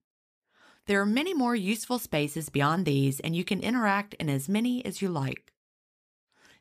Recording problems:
none

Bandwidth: 15 kHz